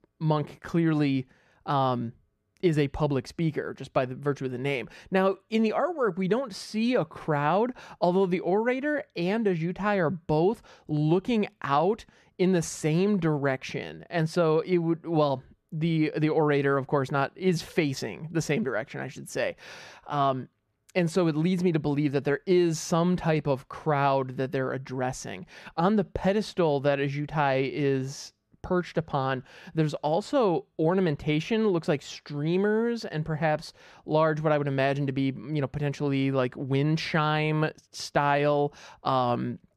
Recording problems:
muffled; slightly; fading above 2.5 kHz

